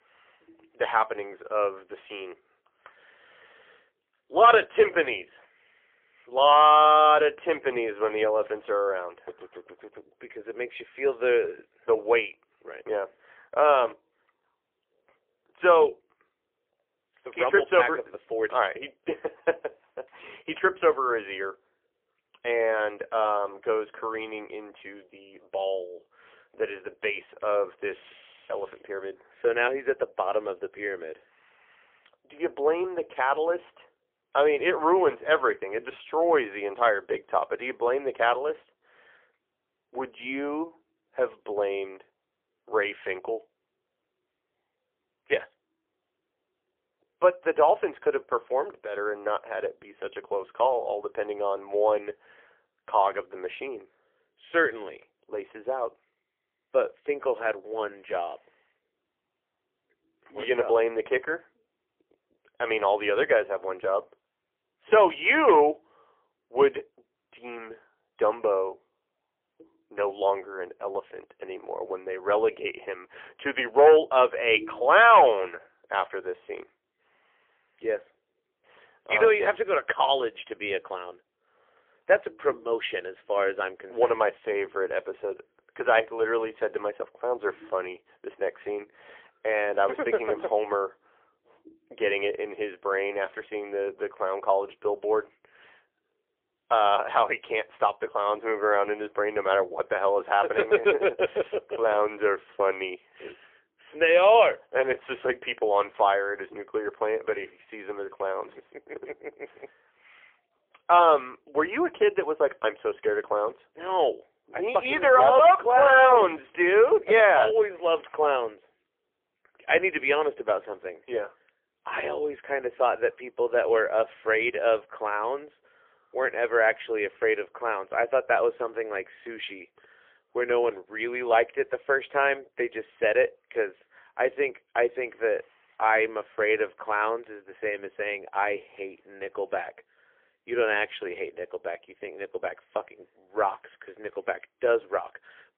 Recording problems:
phone-call audio; poor line; nothing above 3.5 kHz

